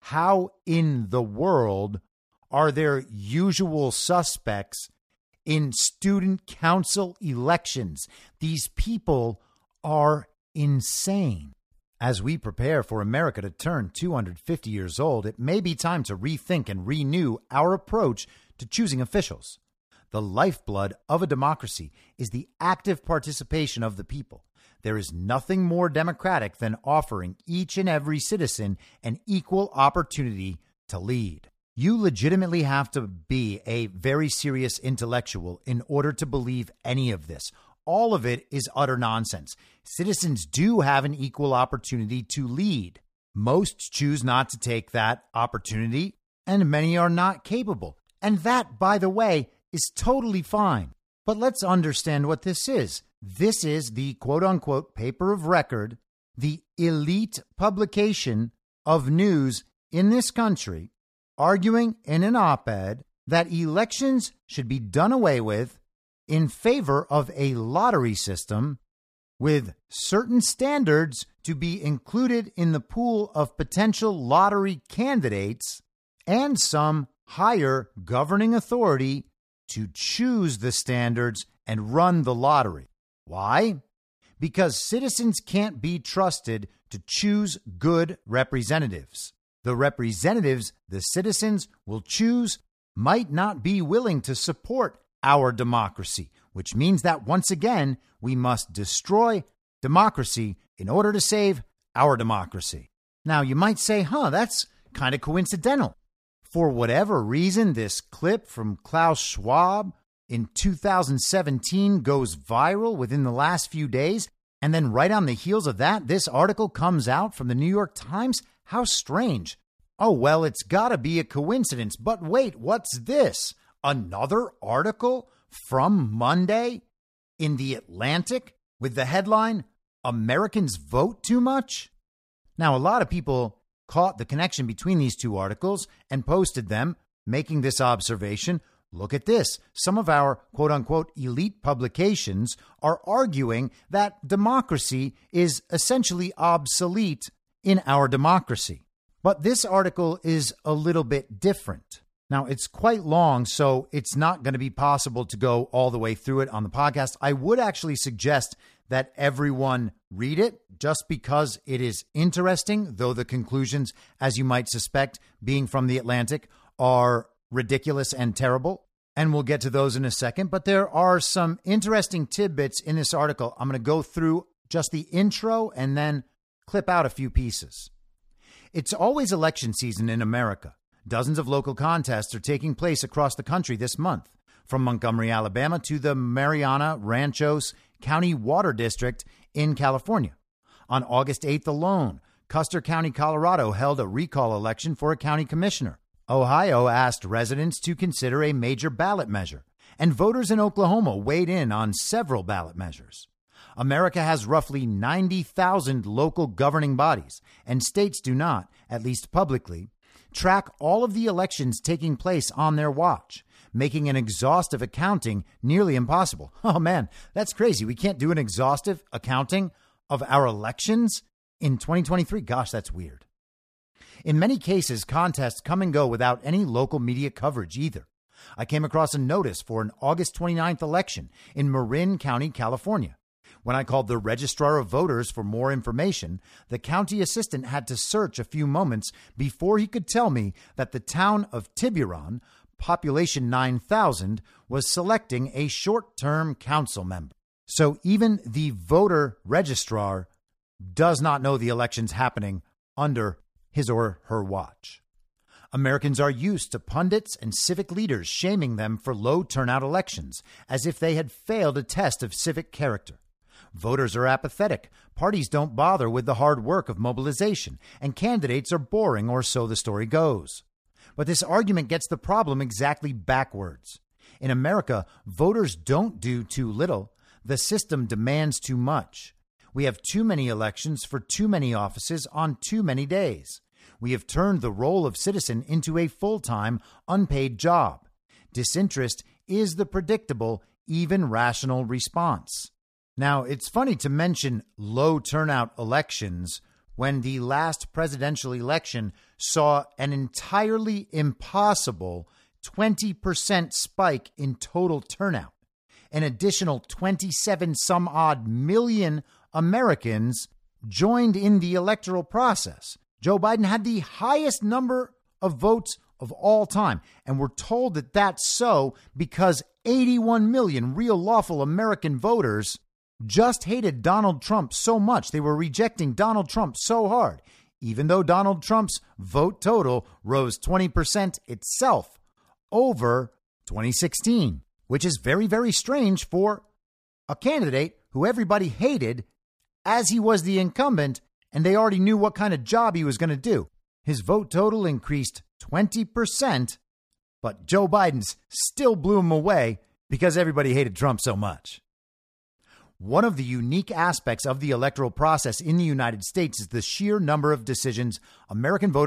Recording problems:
abrupt cut into speech; at the end

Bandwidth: 14.5 kHz